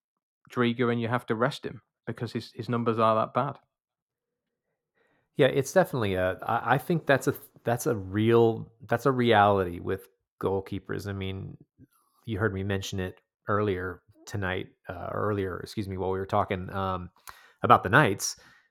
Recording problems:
muffled; slightly; fading above 1.5 kHz

